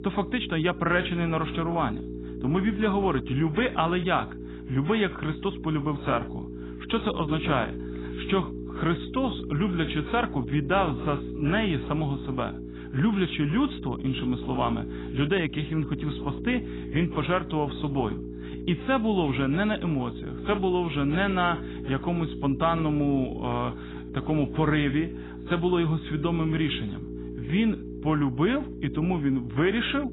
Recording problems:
garbled, watery; badly; nothing above 4 kHz
electrical hum; noticeable; throughout; 60 Hz, 10 dB below the speech

